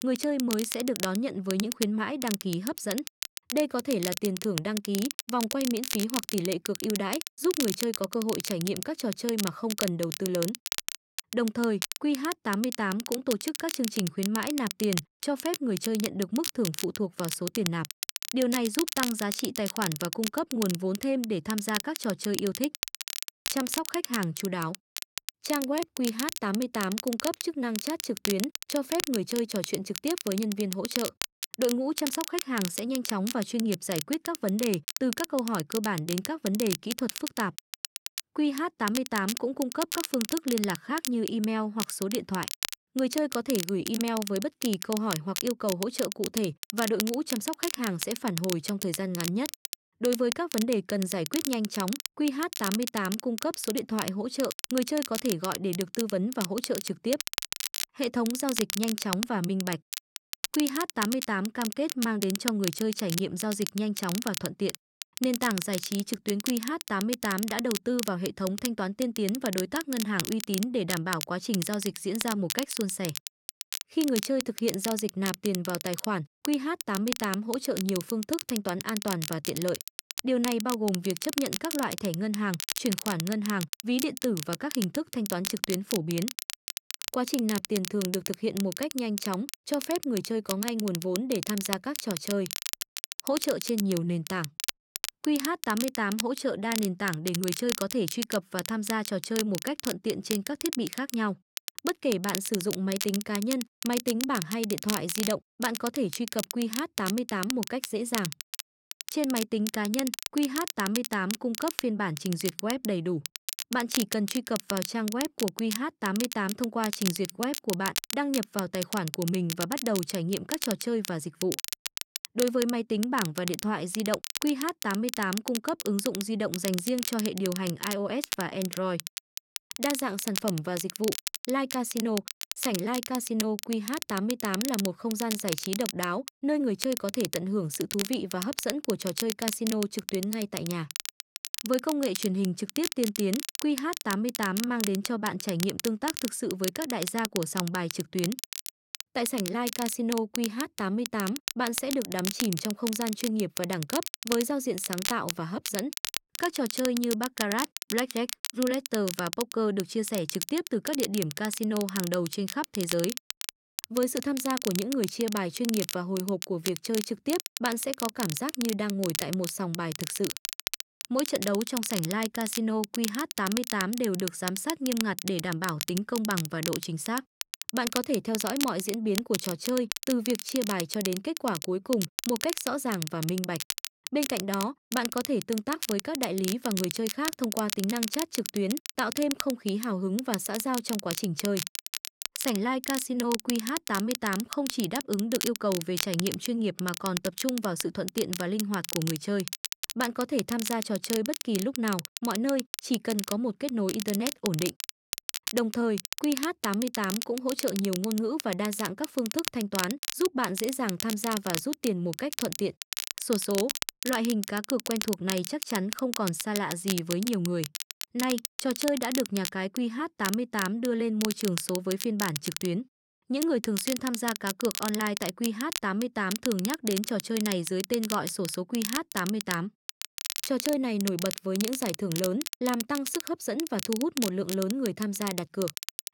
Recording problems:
crackle, like an old record; loud; 5 dB below the speech

